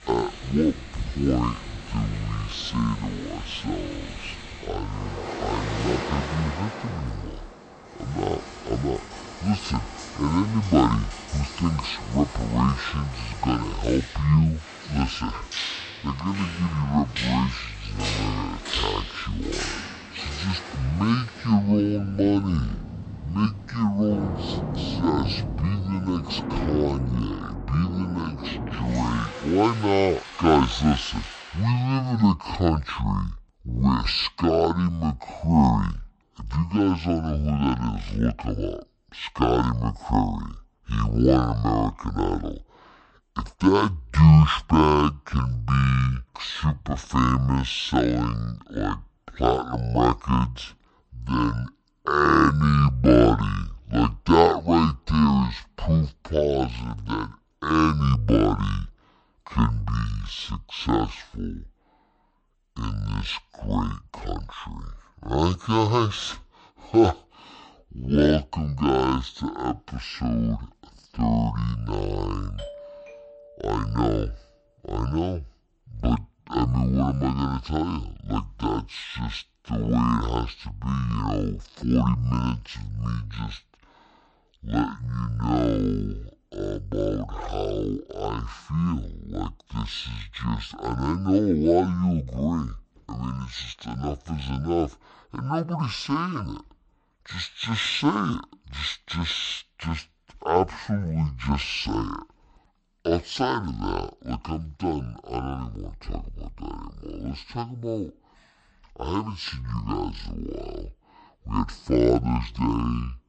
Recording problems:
wrong speed and pitch; too slow and too low; 0.5 times normal speed
rain or running water; loud; until 31 s; 10 dB below the speech
doorbell; faint; from 1:13 to 1:14; peak 15 dB below the speech

